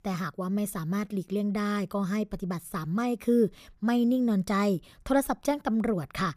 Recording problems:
none

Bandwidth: 15 kHz